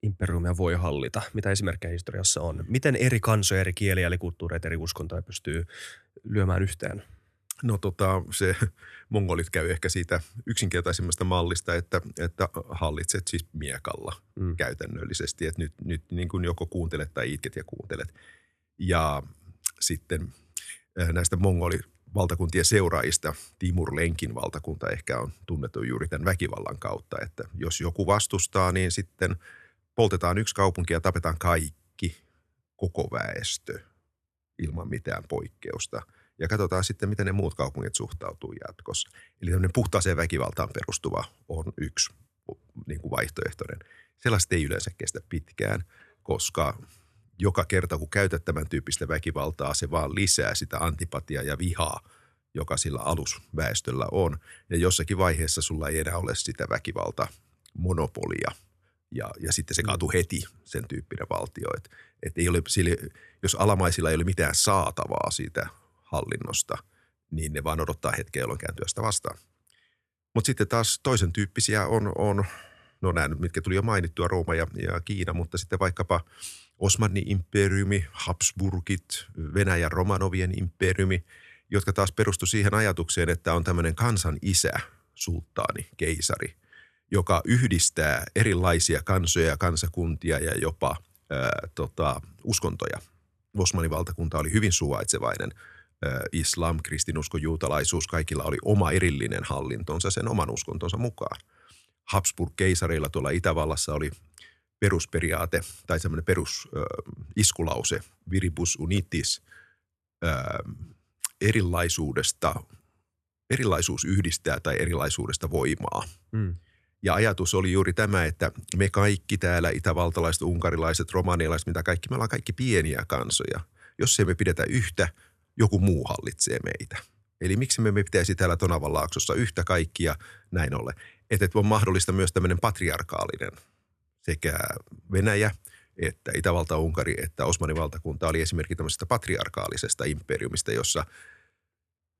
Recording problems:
none

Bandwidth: 13.5 kHz